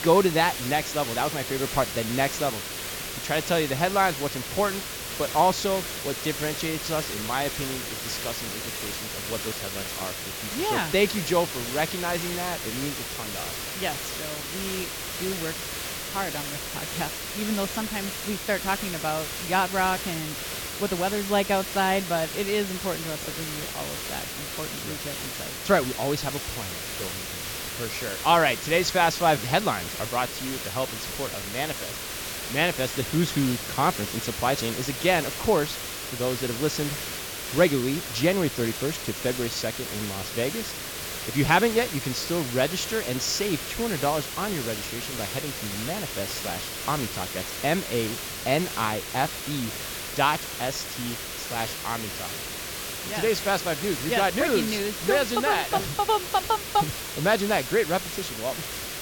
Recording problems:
high frequencies cut off; noticeable; nothing above 7.5 kHz
hiss; loud; throughout; 4 dB below the speech

